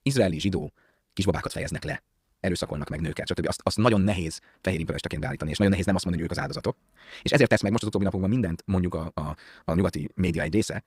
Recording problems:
wrong speed, natural pitch; too fast; 1.8 times normal speed

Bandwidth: 15.5 kHz